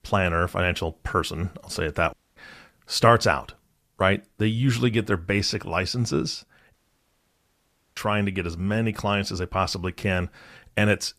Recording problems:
audio cutting out; at 2 s and at 6.5 s for 1 s

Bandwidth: 14.5 kHz